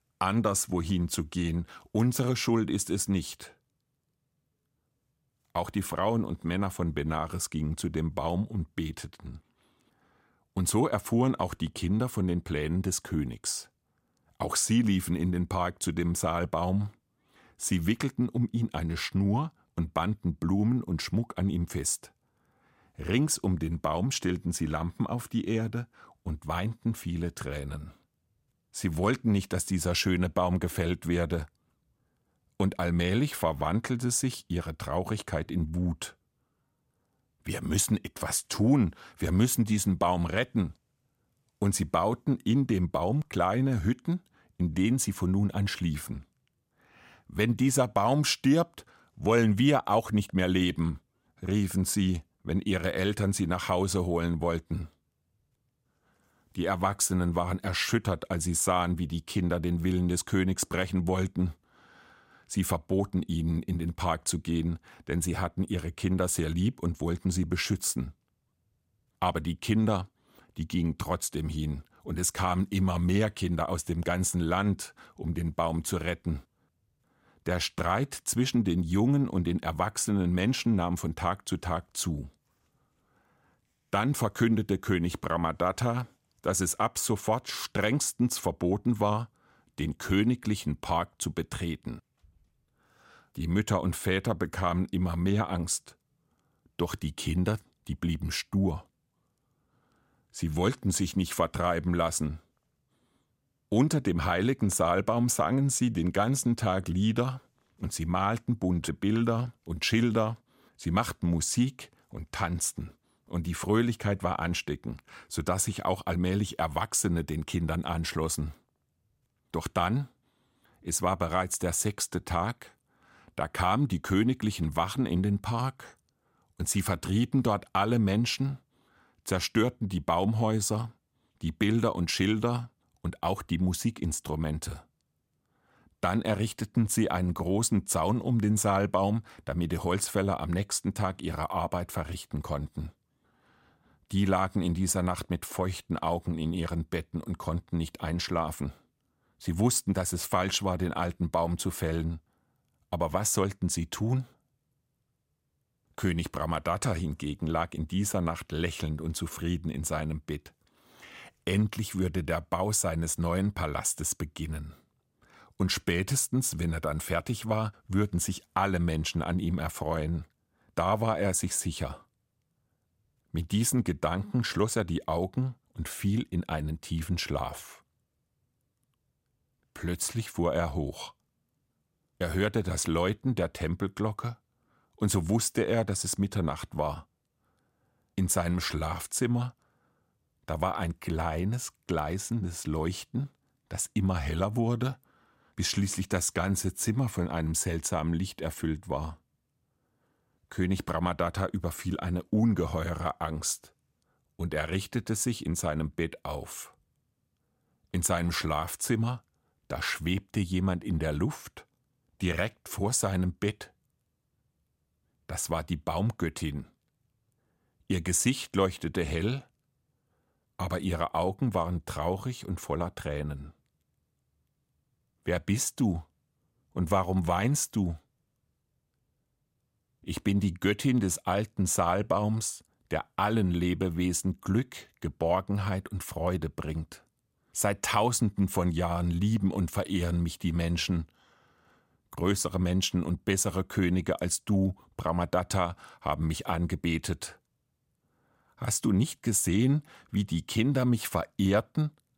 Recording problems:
none

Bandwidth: 16 kHz